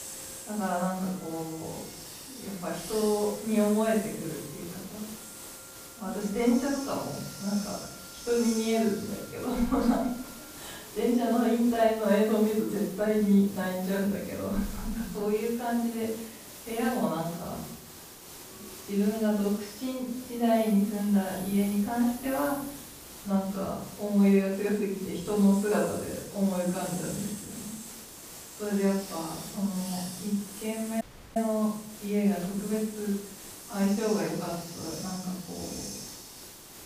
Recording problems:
off-mic speech; far
room echo; noticeable; dies away in 0.7 s
hiss; noticeable; throughout; 15 dB below the speech
background music; faint; until 24 s; 25 dB below the speech
audio cutting out; at 31 s

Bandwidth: 15 kHz